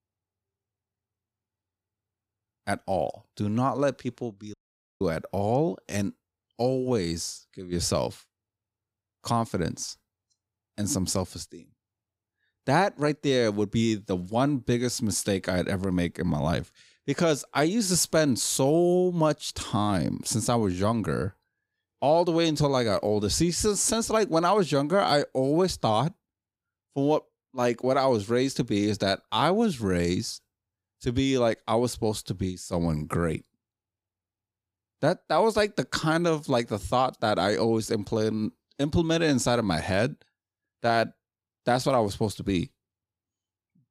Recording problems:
audio cutting out; at 4.5 s

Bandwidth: 15.5 kHz